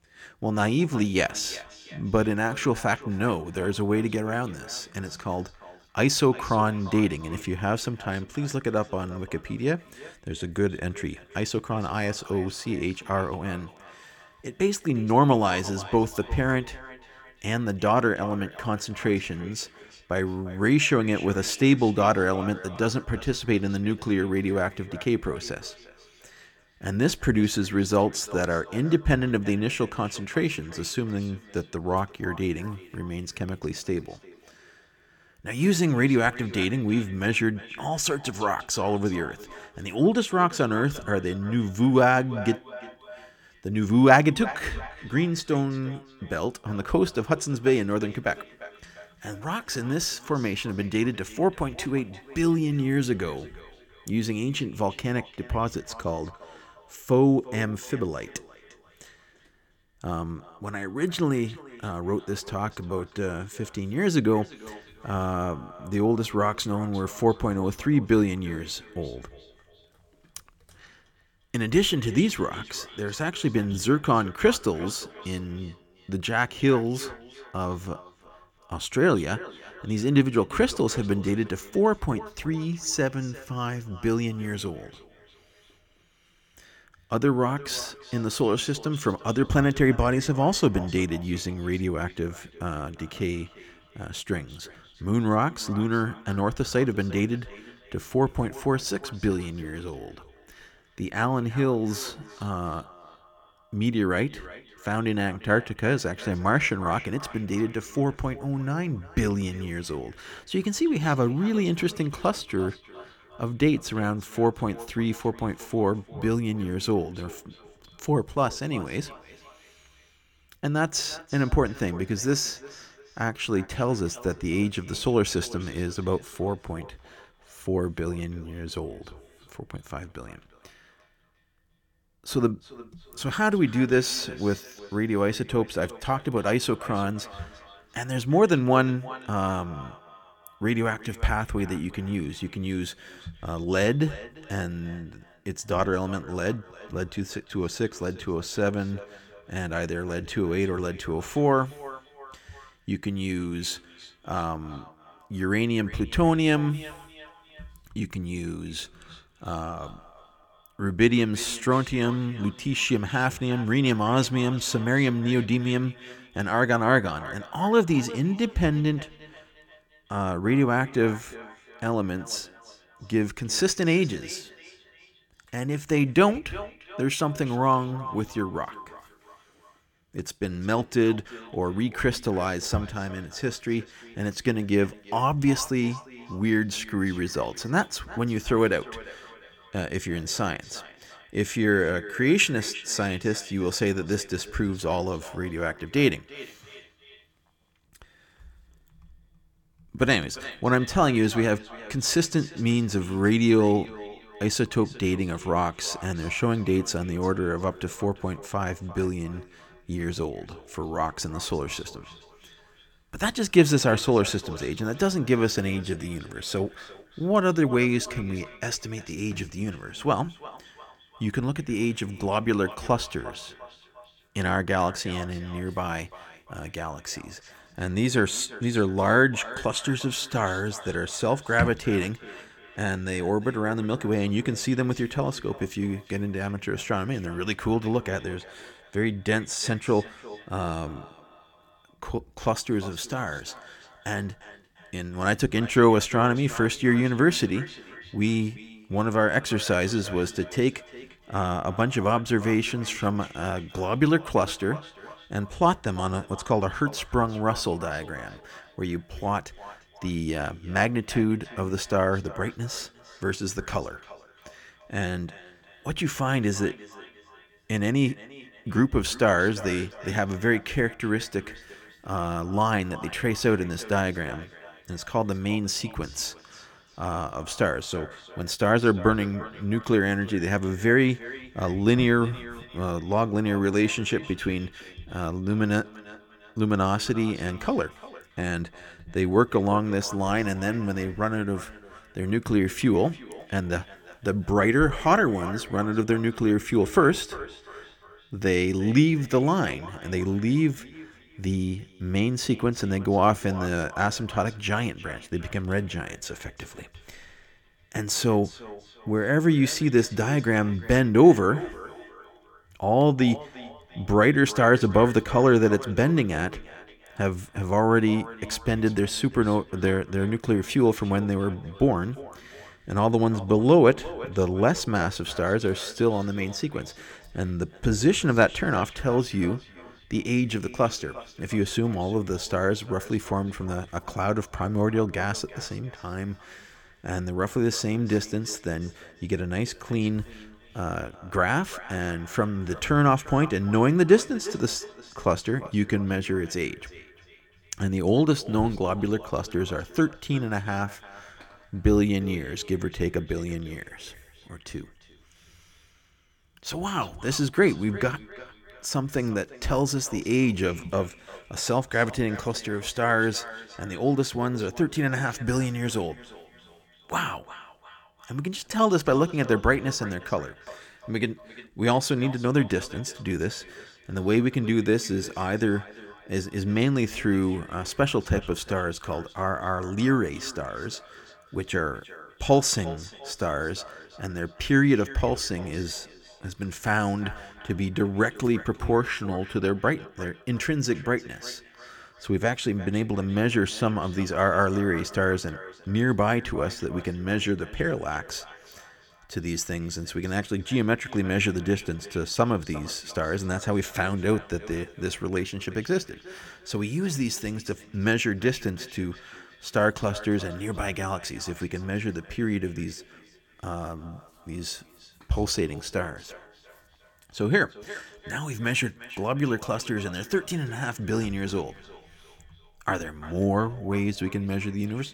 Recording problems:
echo of what is said; faint; throughout; 350 ms later, 20 dB below the speech

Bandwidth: 17.5 kHz